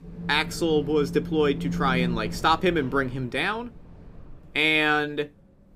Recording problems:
wind in the background; loud; throughout; 8 dB below the speech

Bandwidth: 15.5 kHz